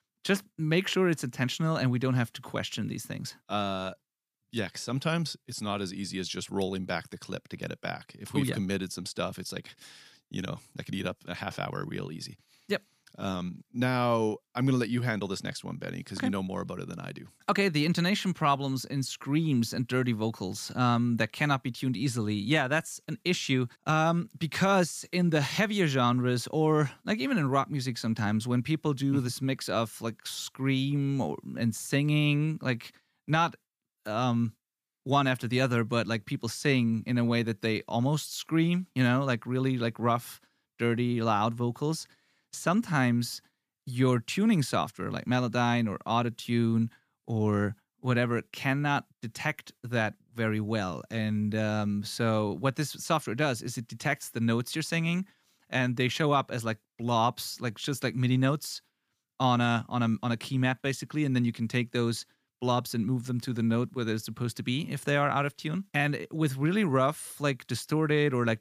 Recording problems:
none

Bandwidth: 15 kHz